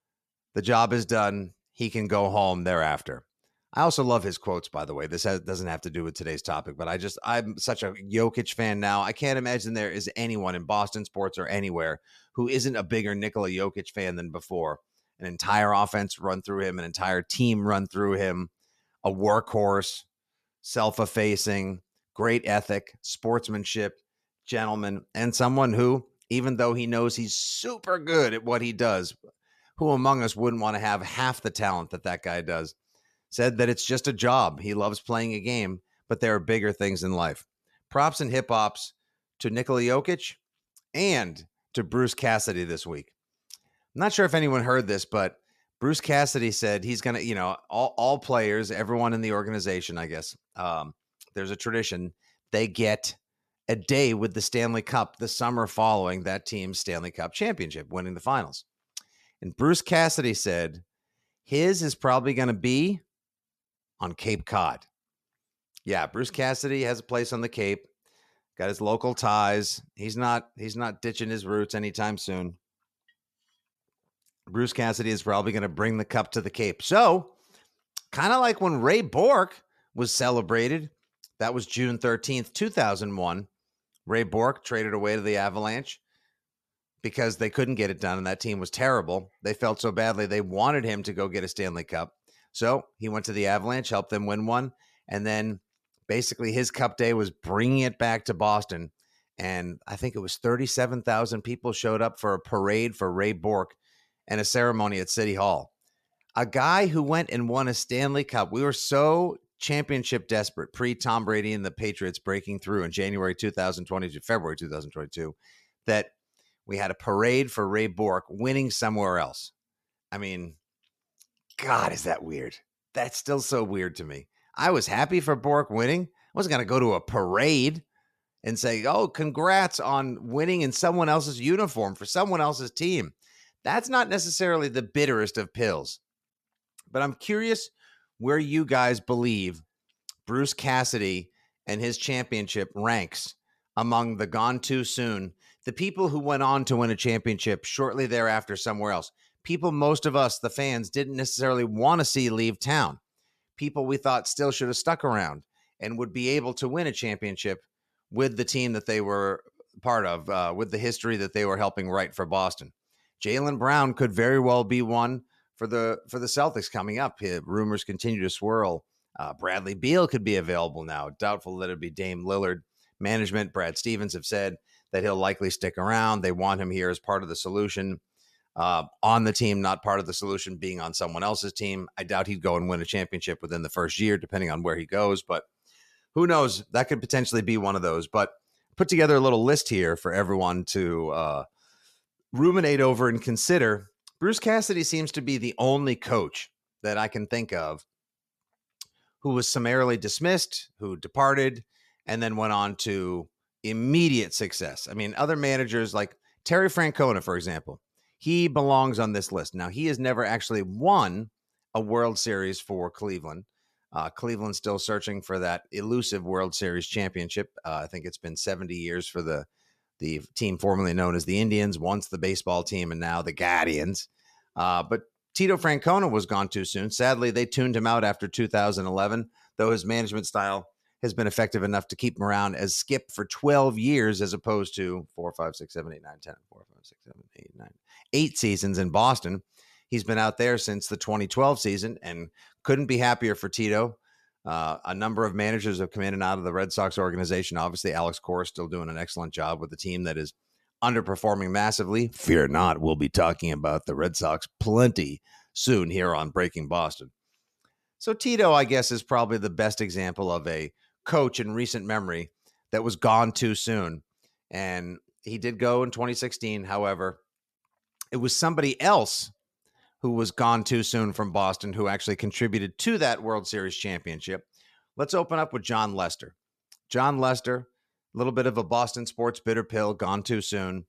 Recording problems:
none

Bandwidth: 14 kHz